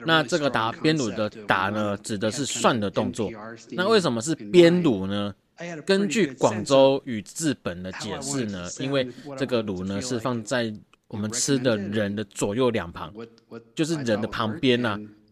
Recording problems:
voice in the background; noticeable; throughout; 15 dB below the speech

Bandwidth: 14.5 kHz